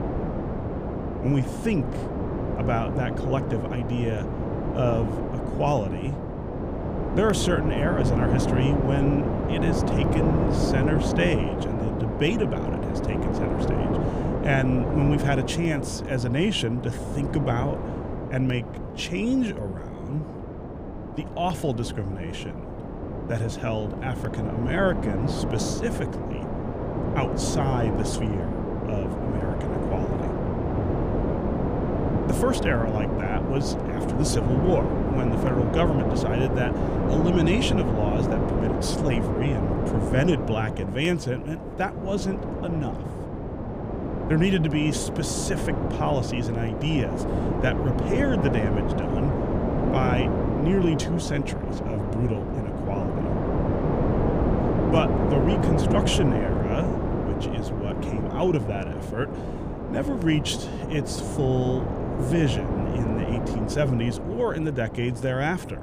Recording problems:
wind noise on the microphone; heavy; 1 dB below the speech

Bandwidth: 15 kHz